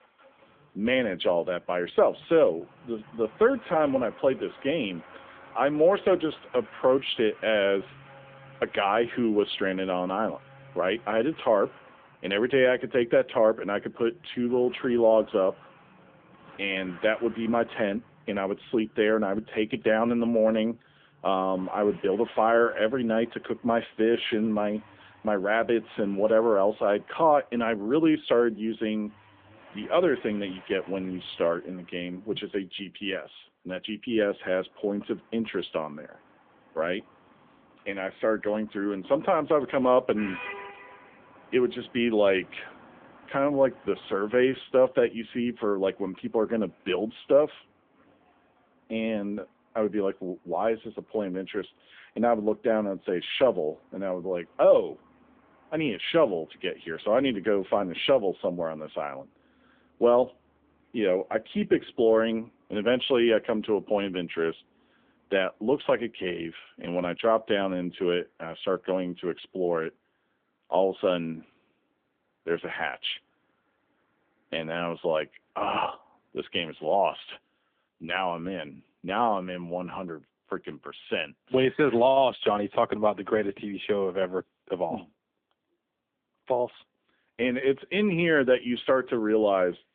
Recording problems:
phone-call audio; nothing above 3.5 kHz
traffic noise; faint; throughout; 25 dB below the speech

